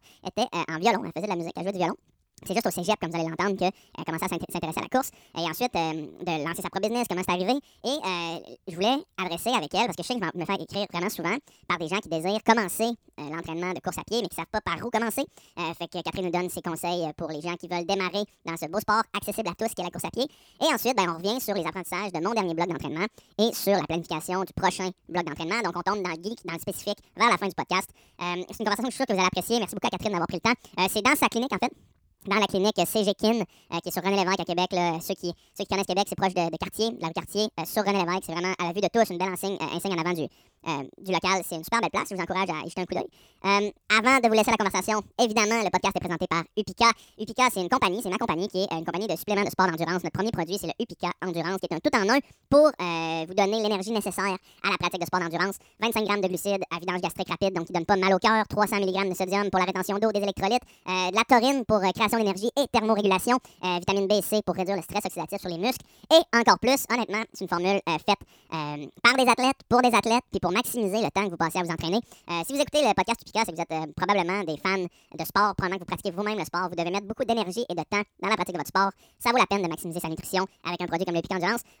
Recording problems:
wrong speed and pitch; too fast and too high; 1.6 times normal speed

